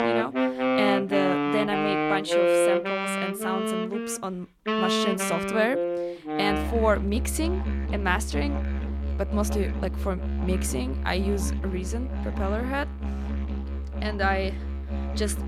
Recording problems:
background music; very loud; throughout; 1 dB above the speech

